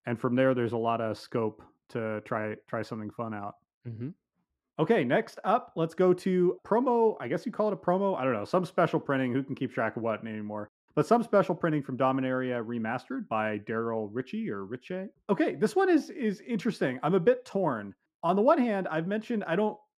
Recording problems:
muffled; very; fading above 2.5 kHz

